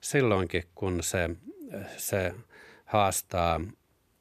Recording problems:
none

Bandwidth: 14 kHz